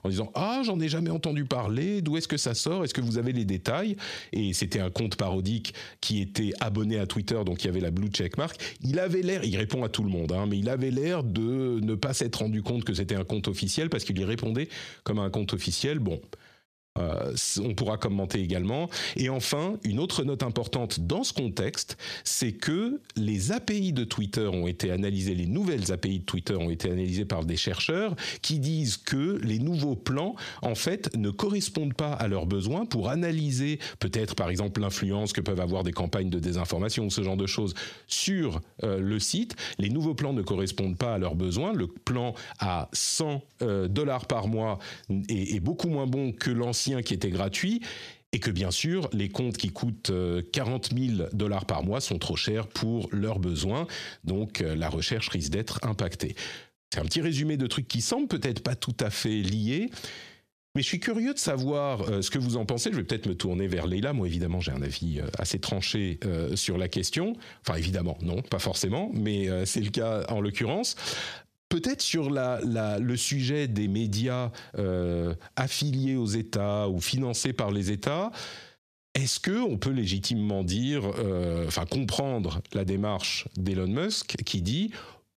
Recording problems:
squashed, flat; heavily

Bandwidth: 14.5 kHz